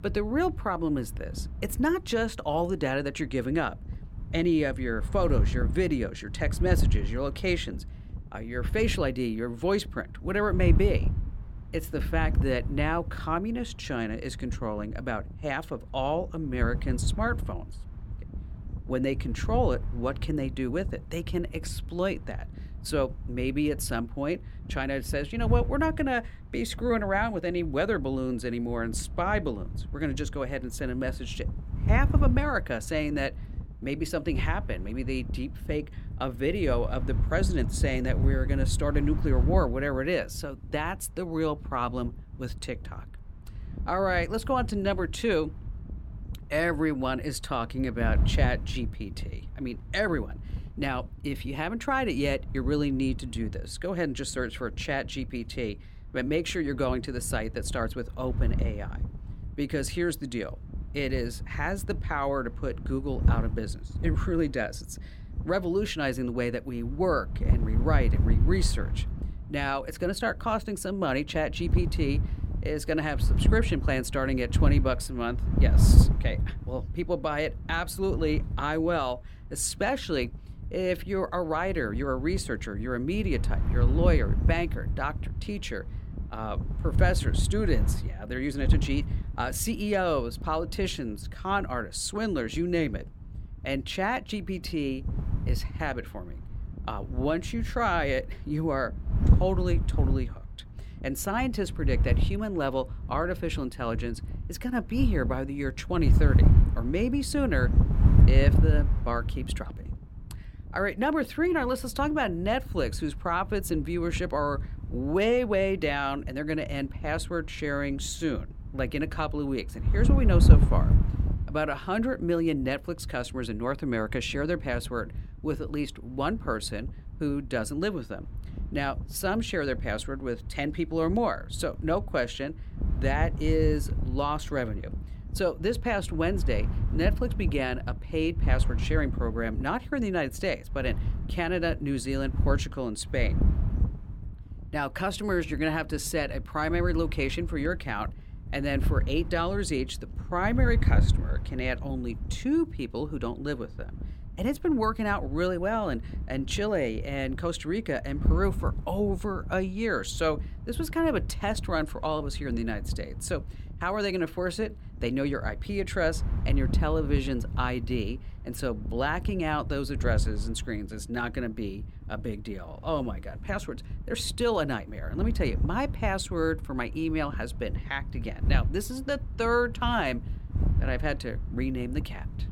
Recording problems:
wind noise on the microphone; occasional gusts; 15 dB below the speech

